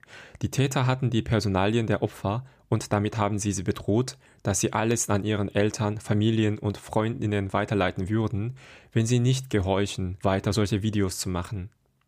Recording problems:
none

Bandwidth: 15 kHz